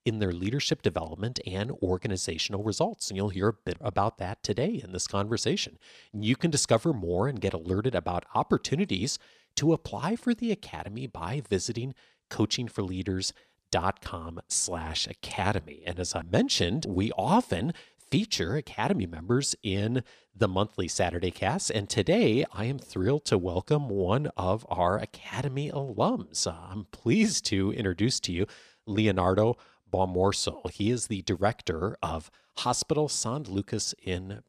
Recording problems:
none

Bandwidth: 14 kHz